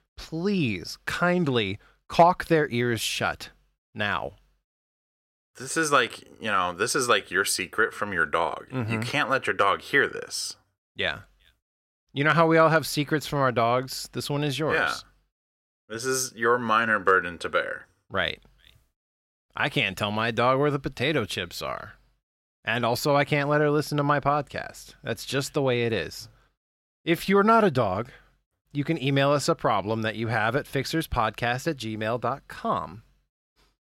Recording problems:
none

